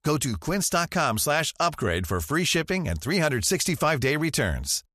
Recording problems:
none

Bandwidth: 14 kHz